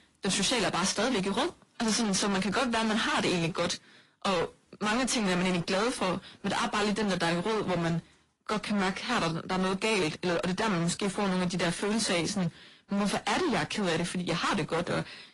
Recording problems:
distortion; heavy; 31% of the sound clipped
garbled, watery; slightly; nothing above 11 kHz

